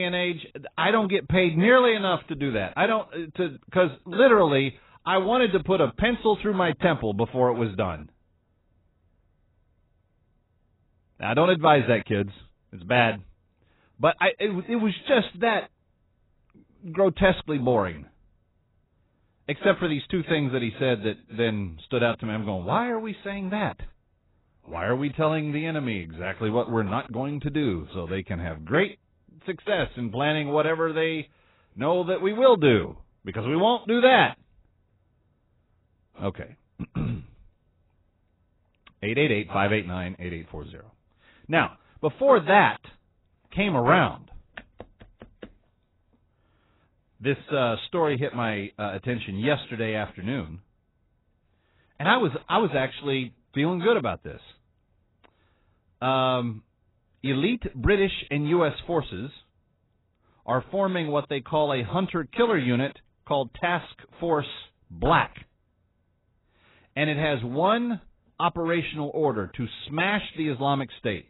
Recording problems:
garbled, watery; badly; nothing above 4 kHz
abrupt cut into speech; at the start

